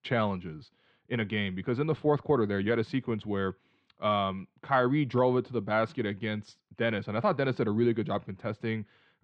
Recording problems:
muffled; slightly; fading above 3.5 kHz

